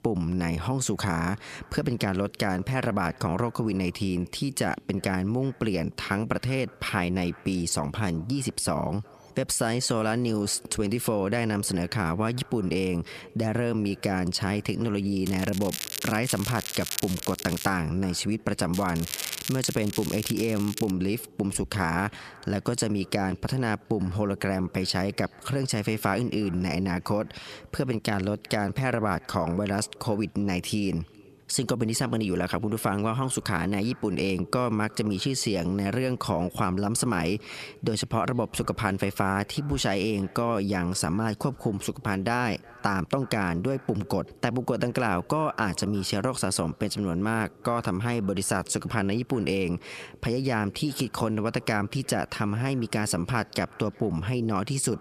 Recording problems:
squashed, flat; heavily
echo of what is said; faint; throughout; 370 ms later, 25 dB below the speech
crackling; loud; from 15 to 18 s and from 19 to 21 s; 7 dB below the speech

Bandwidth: 14.5 kHz